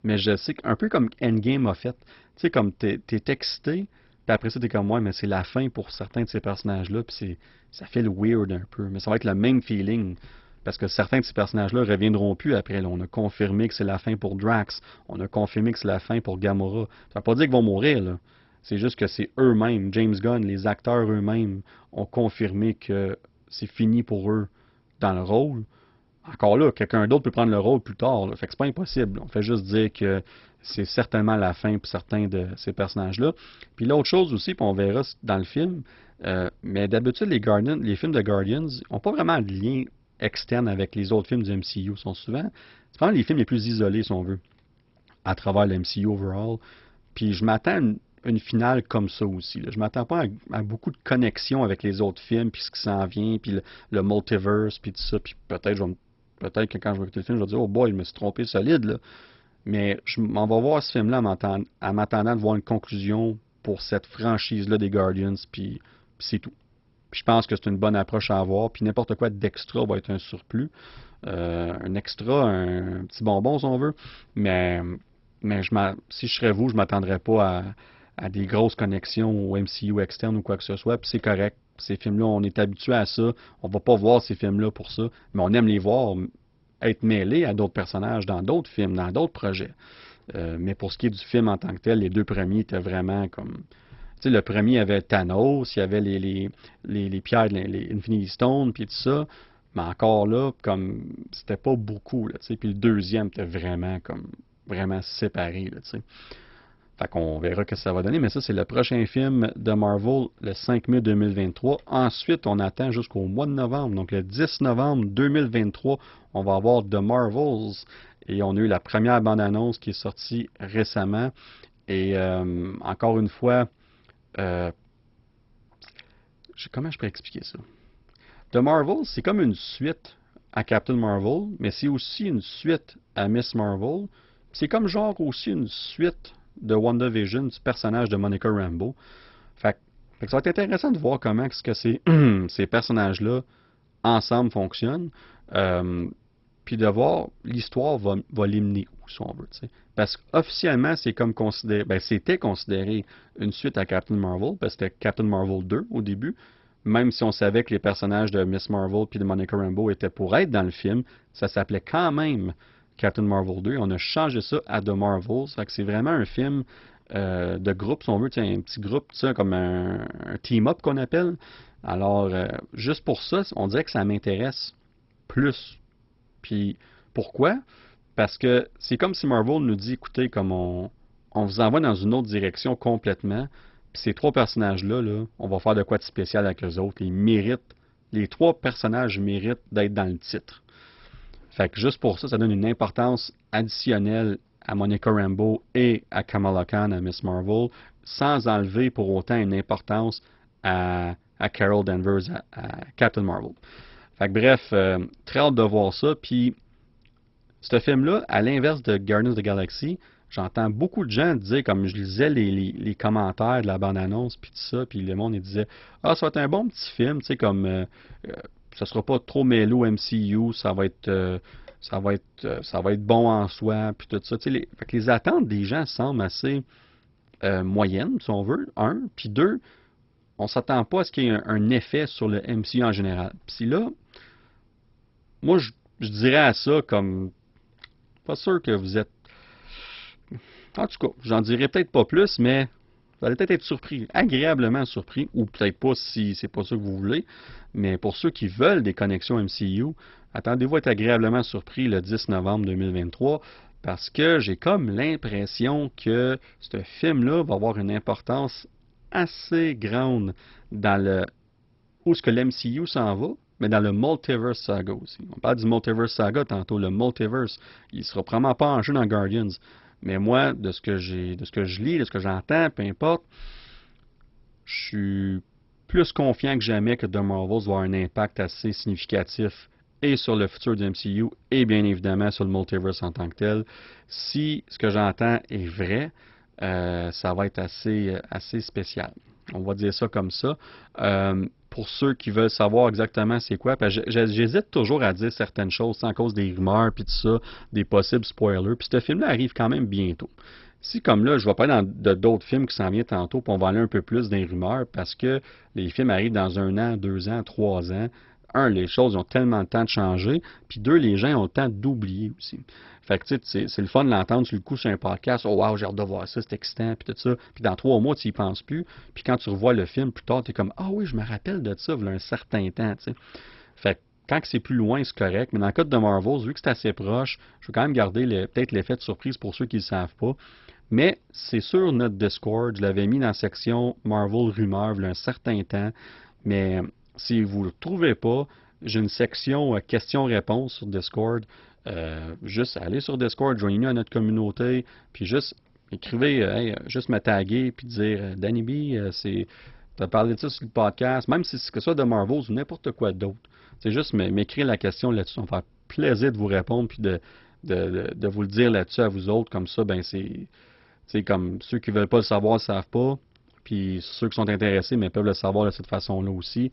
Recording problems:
garbled, watery; badly; nothing above 5.5 kHz
uneven, jittery; strongly; from 43 s to 6:02

